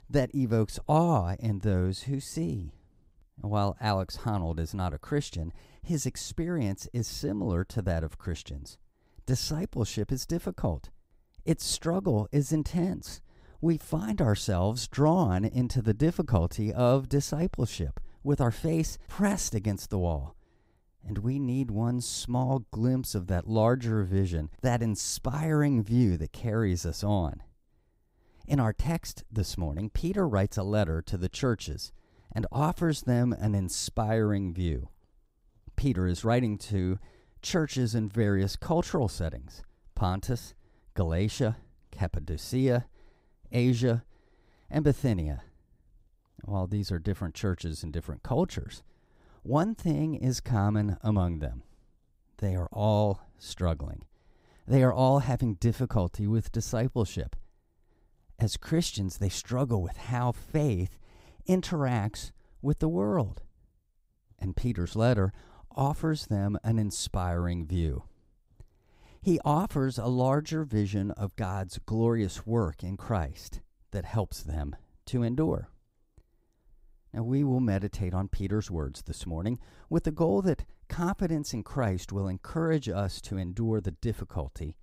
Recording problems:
none

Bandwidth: 15.5 kHz